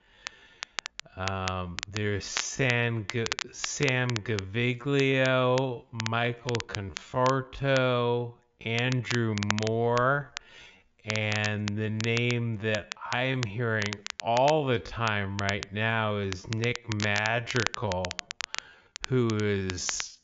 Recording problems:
wrong speed, natural pitch; too slow; 0.5 times normal speed
high frequencies cut off; noticeable; nothing above 7 kHz
crackle, like an old record; loud; 9 dB below the speech

